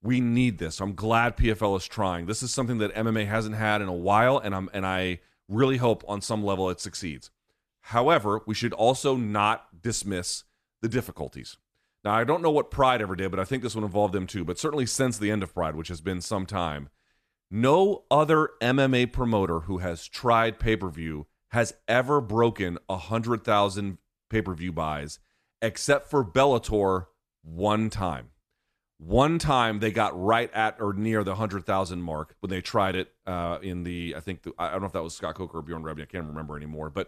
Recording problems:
none

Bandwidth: 14 kHz